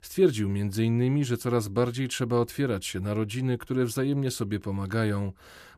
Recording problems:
none

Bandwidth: 14.5 kHz